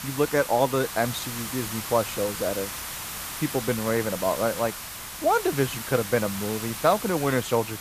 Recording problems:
hiss; loud; throughout; 7 dB below the speech

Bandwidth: 14.5 kHz